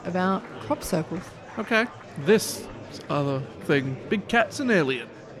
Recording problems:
murmuring crowd; noticeable; throughout; 15 dB below the speech

